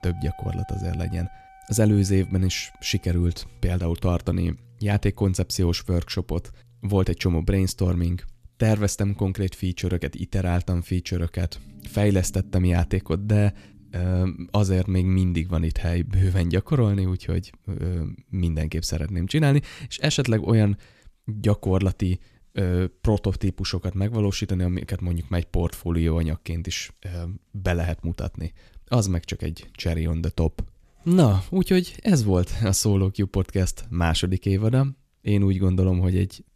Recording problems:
background music; faint; until 16 s; 25 dB below the speech

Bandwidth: 14.5 kHz